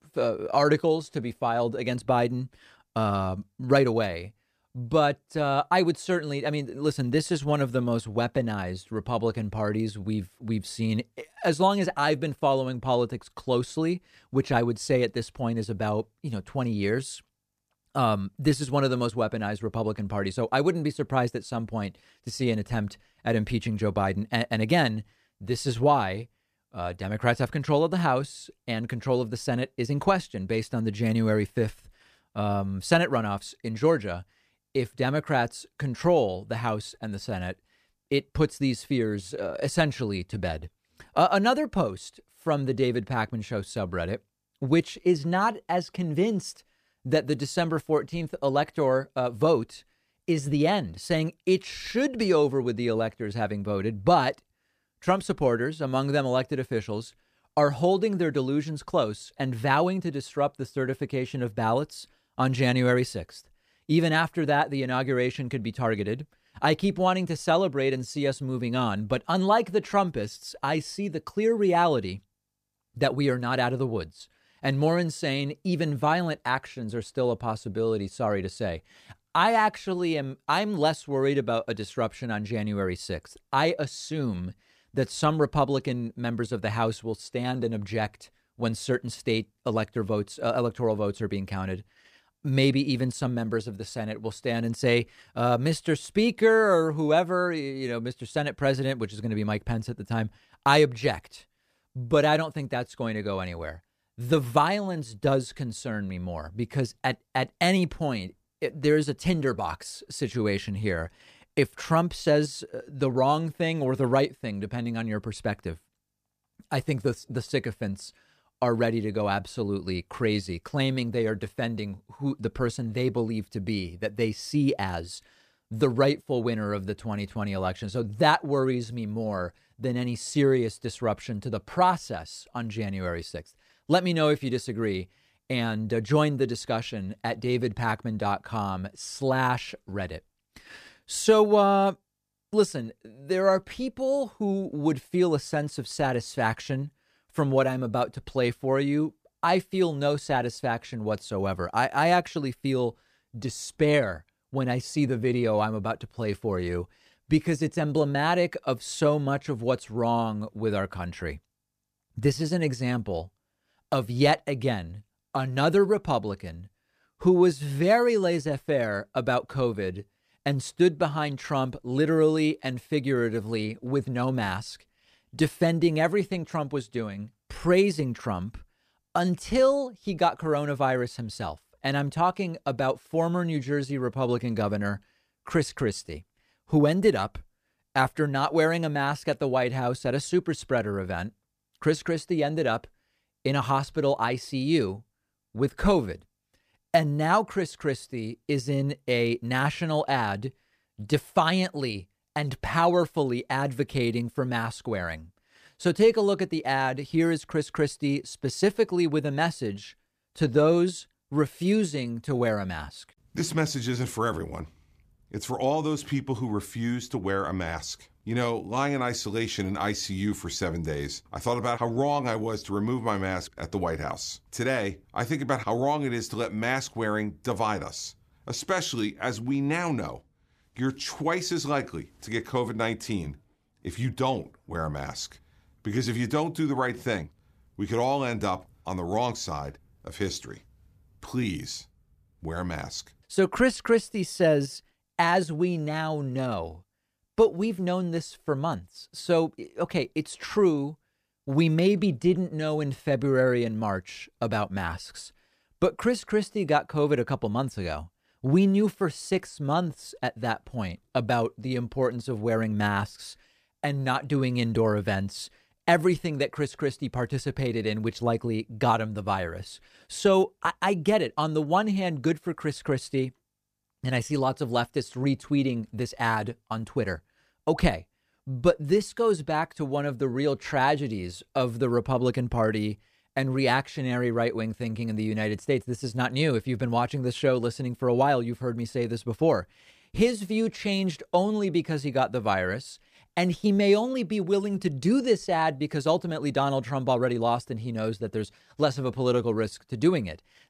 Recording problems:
none

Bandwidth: 14.5 kHz